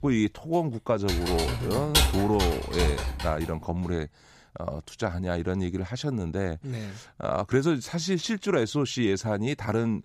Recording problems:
household noises; very loud; until 3.5 s; as loud as the speech

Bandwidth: 15 kHz